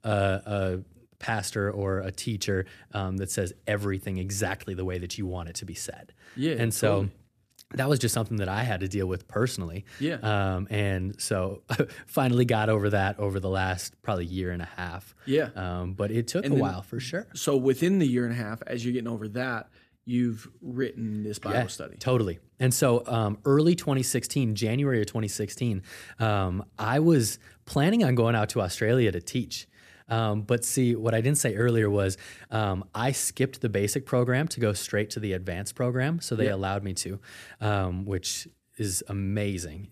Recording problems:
none

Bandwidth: 14.5 kHz